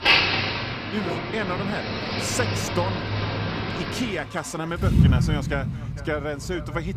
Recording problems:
echo of what is said; noticeable; throughout; 450 ms later, 15 dB below the speech
traffic noise; very loud; throughout; 5 dB above the speech

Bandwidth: 15 kHz